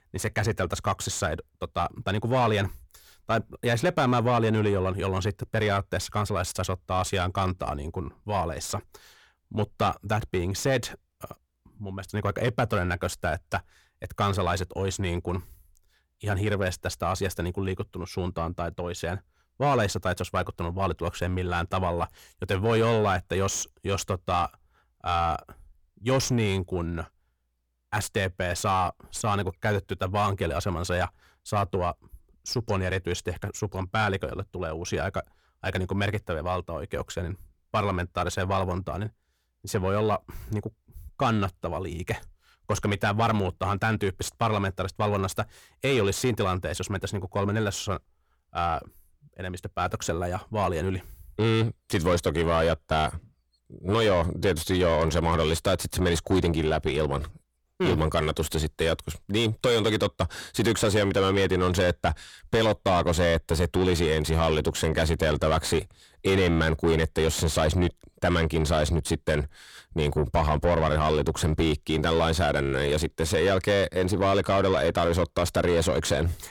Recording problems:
distortion; heavy; 7 dB below the speech

